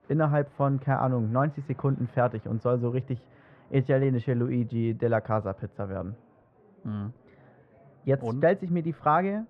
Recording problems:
muffled; very; fading above 1 kHz
murmuring crowd; faint; throughout; 30 dB below the speech

